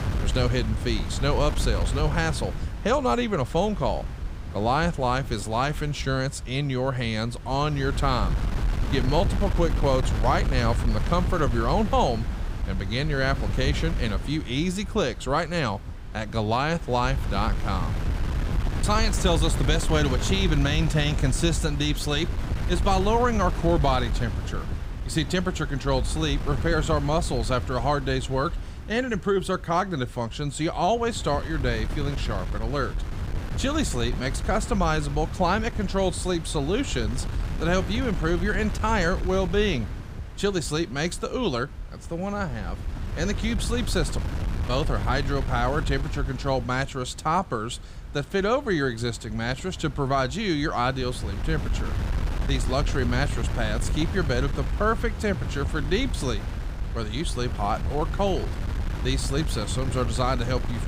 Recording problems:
wind noise on the microphone; occasional gusts; 10 dB below the speech

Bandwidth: 15.5 kHz